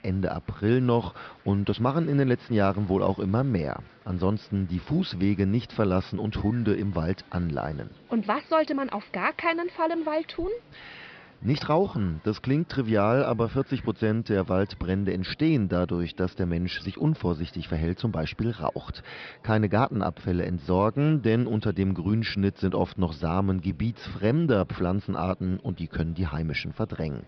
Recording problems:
high frequencies cut off; noticeable; nothing above 5.5 kHz
murmuring crowd; faint; throughout; 25 dB below the speech

